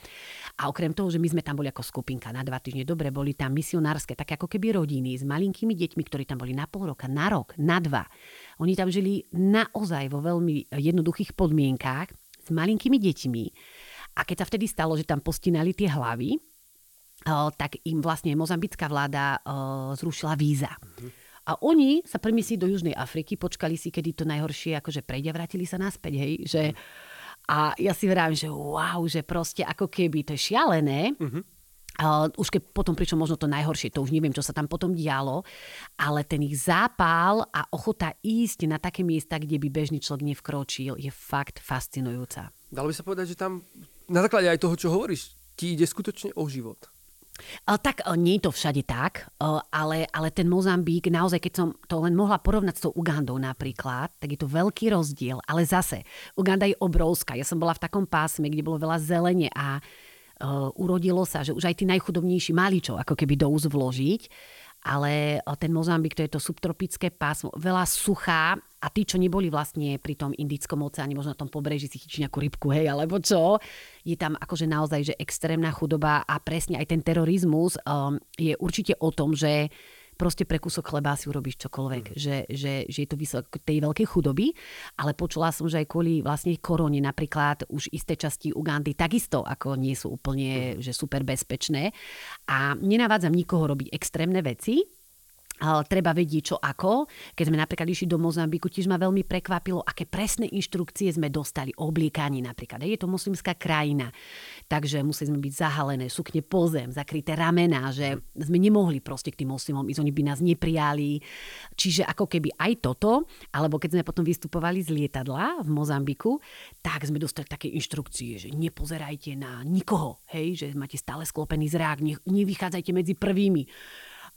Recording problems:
hiss; faint; throughout; 30 dB below the speech

